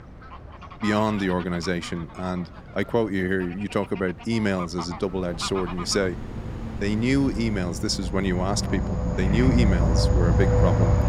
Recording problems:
animal sounds; loud; throughout; 1 dB below the speech
wind noise on the microphone; occasional gusts; 20 dB below the speech

